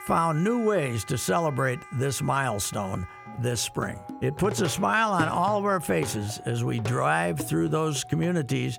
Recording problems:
background music; noticeable; throughout; 15 dB below the speech

